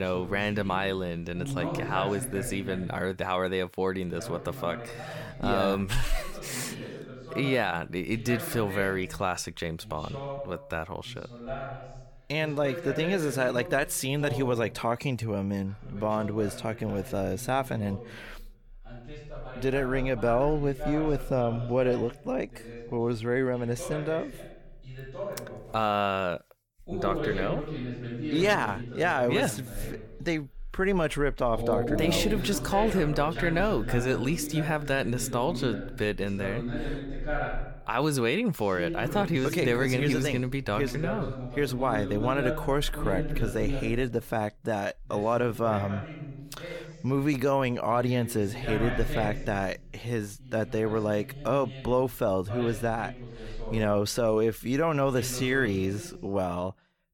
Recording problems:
voice in the background; loud; throughout; 8 dB below the speech
abrupt cut into speech; at the start

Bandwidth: 17.5 kHz